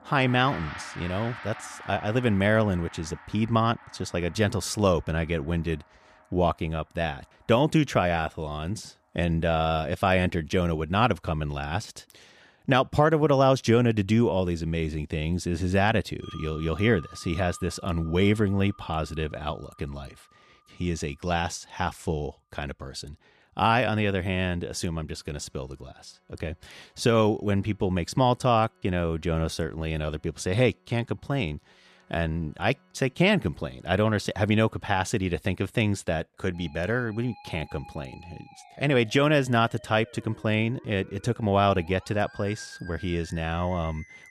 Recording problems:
background music; noticeable; throughout; 20 dB below the speech

